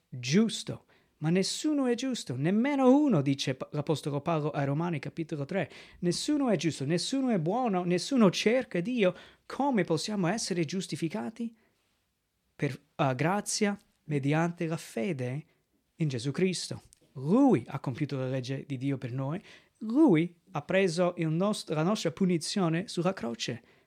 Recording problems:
none

